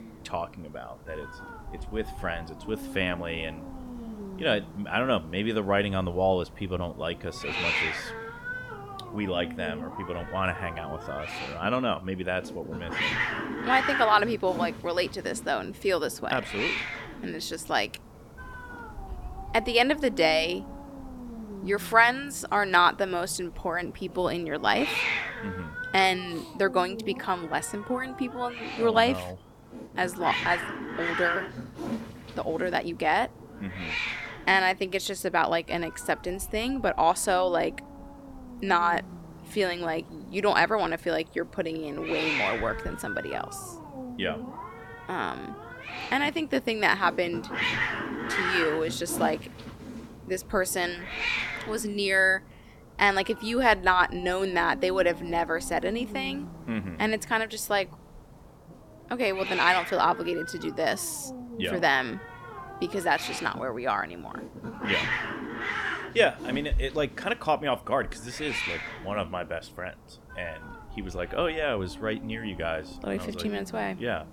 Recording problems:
hiss; loud; throughout; 7 dB below the speech

